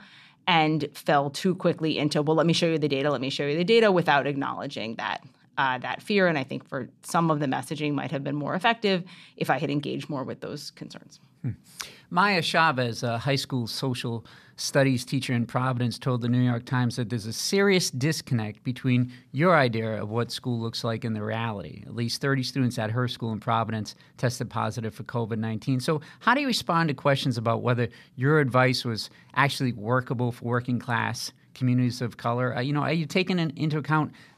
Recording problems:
none

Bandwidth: 14.5 kHz